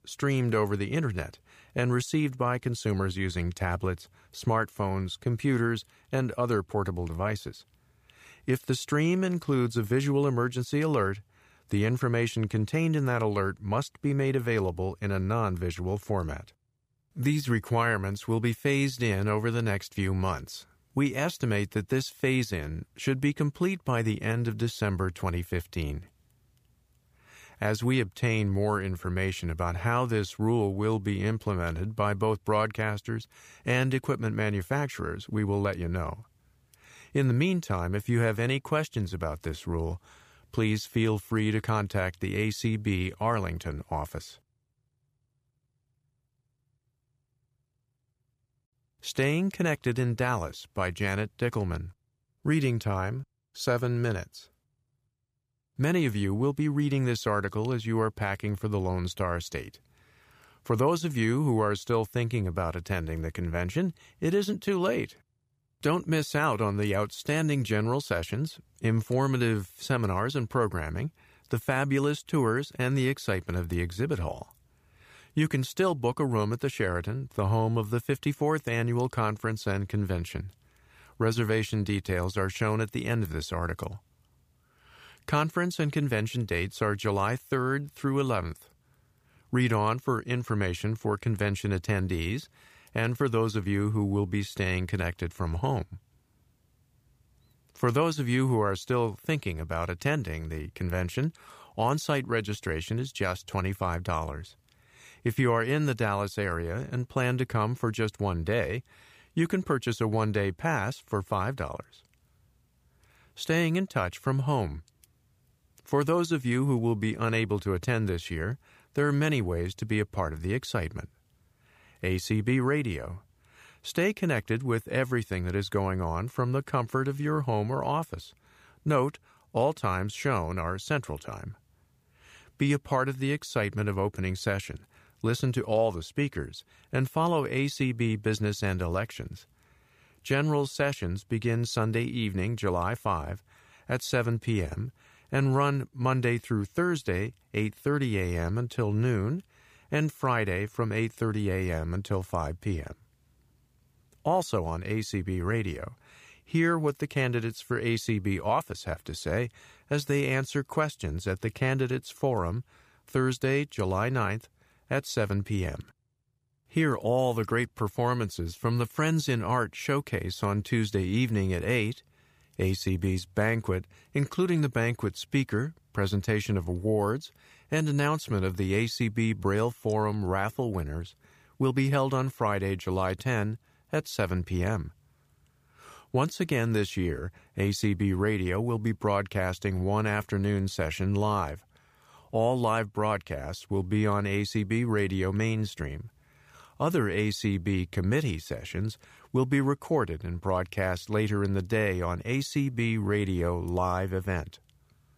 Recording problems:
none

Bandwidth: 15 kHz